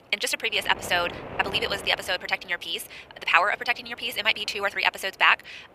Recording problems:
thin; very; fading below 850 Hz
wrong speed, natural pitch; too fast; 1.5 times normal speed
wind noise on the microphone; occasional gusts; 20 dB below the speech

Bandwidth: 15 kHz